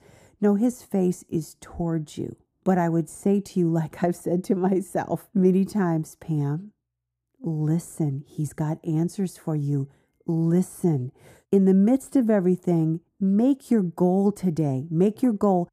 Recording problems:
muffled; very; fading above 1.5 kHz

